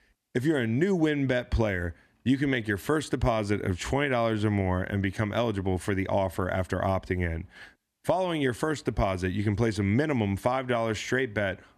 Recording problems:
none

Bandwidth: 13.5 kHz